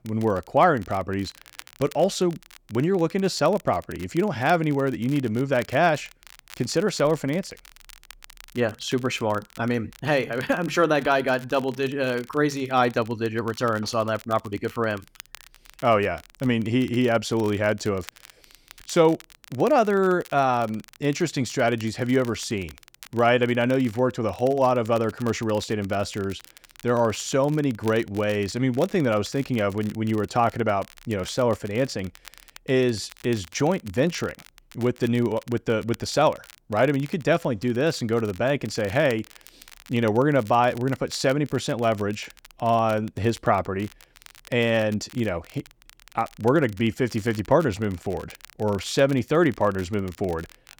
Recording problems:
crackle, like an old record; faint; 25 dB below the speech

